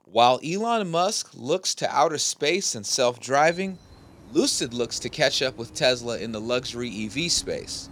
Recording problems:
animal sounds; faint; throughout; 25 dB below the speech

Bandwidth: 18 kHz